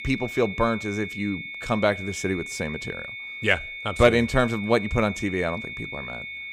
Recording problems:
high-pitched whine; loud; throughout; 2 kHz, 9 dB below the speech

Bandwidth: 15.5 kHz